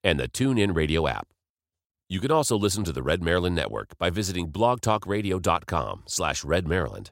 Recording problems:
none

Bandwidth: 16 kHz